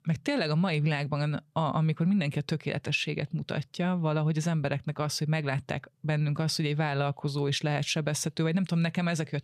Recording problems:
none

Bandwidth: 14.5 kHz